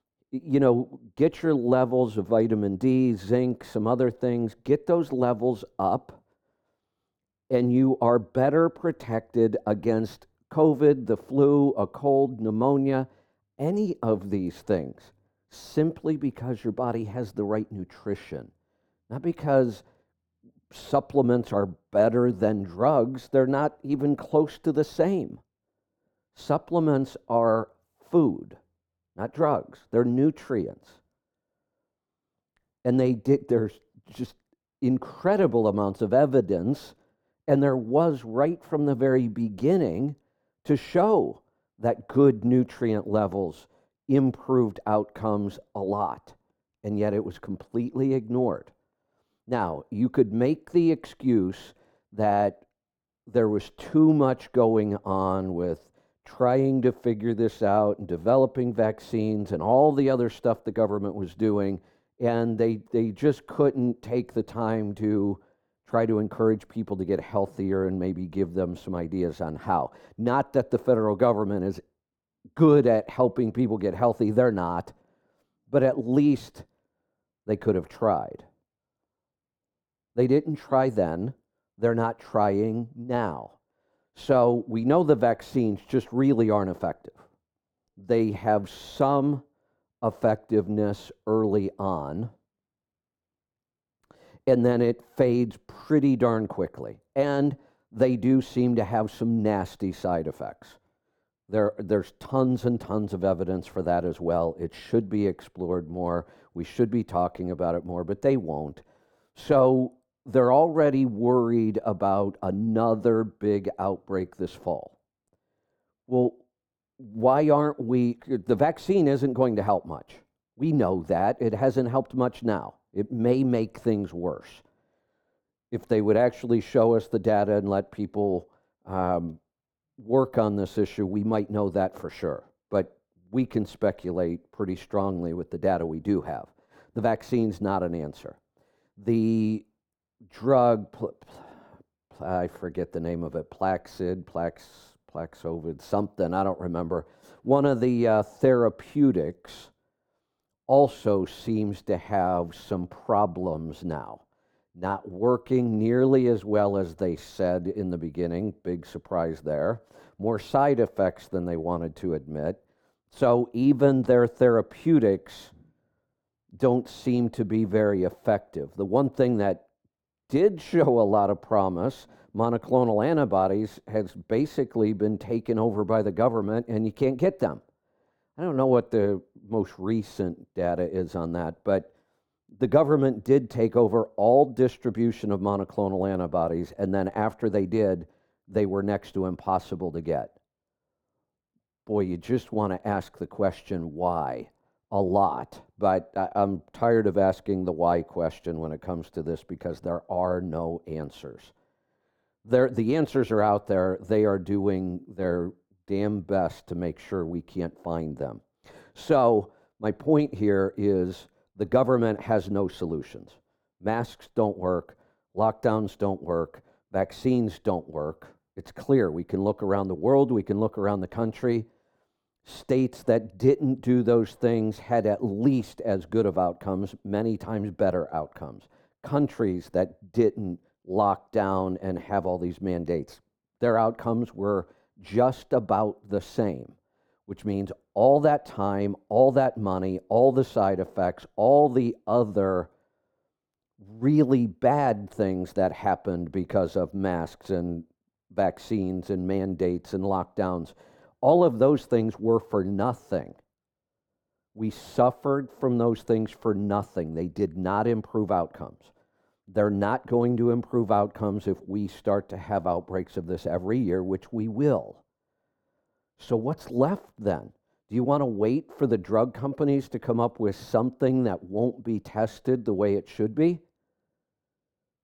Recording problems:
muffled; very; fading above 1.5 kHz

